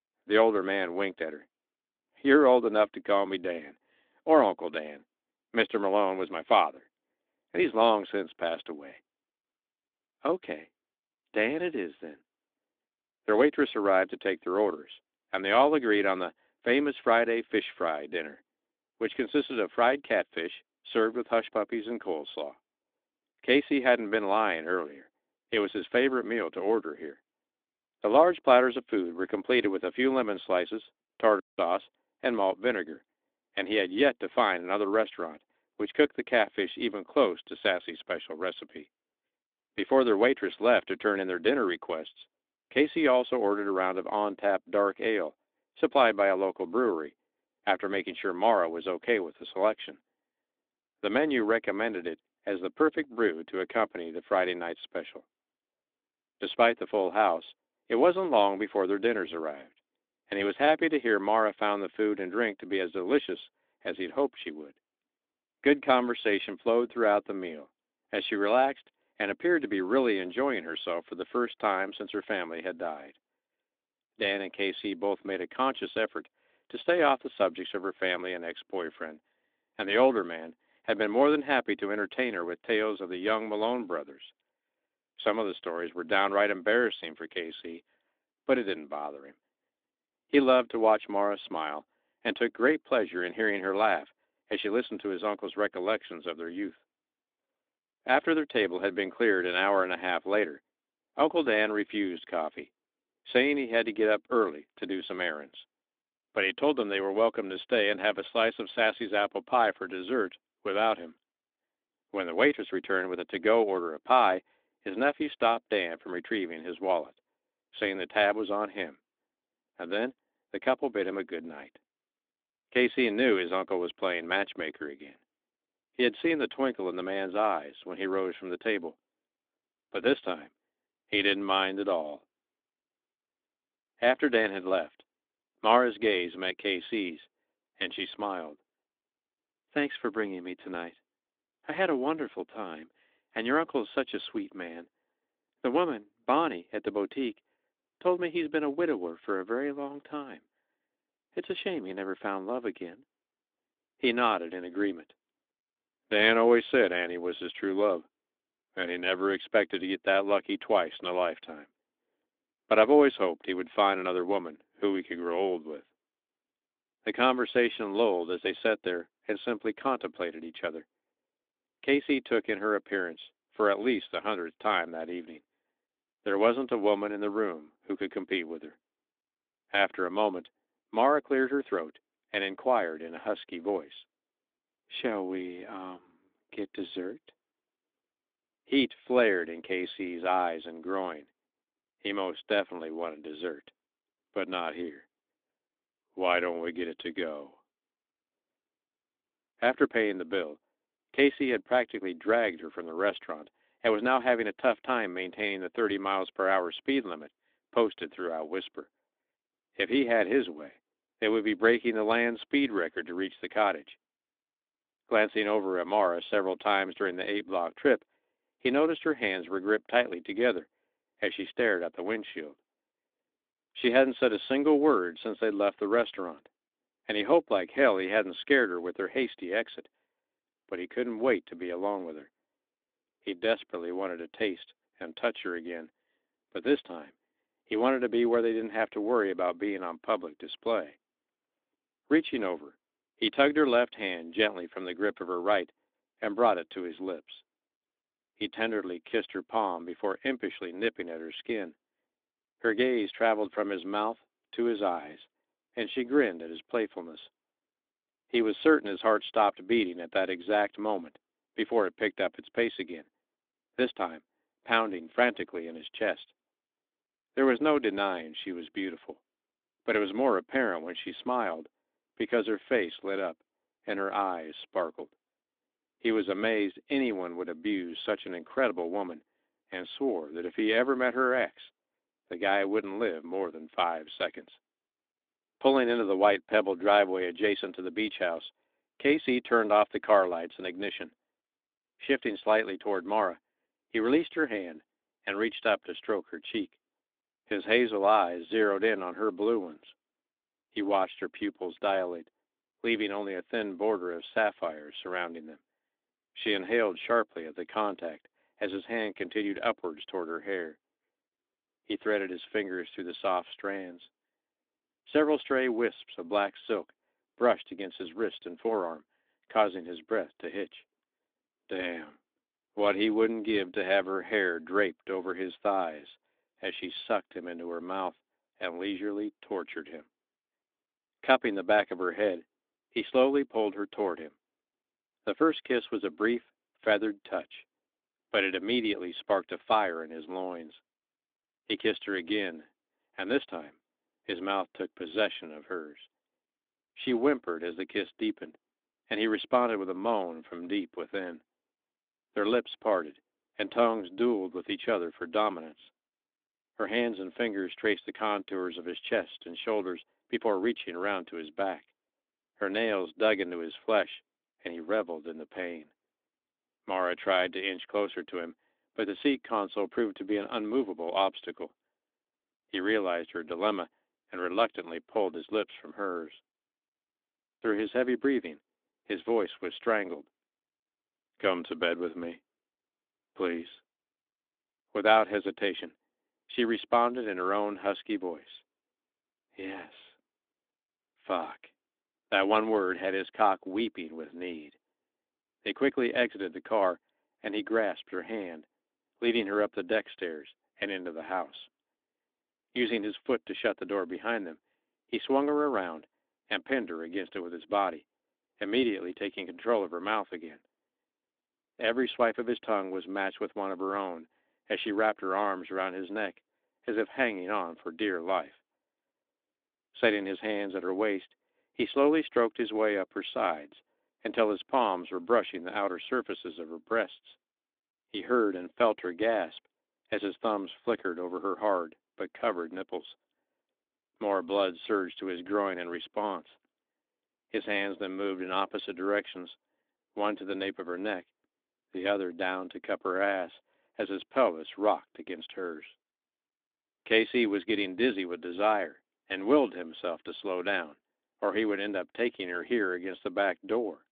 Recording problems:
phone-call audio; nothing above 3.5 kHz

